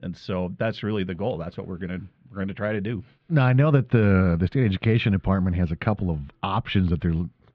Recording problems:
muffled; very; fading above 3.5 kHz

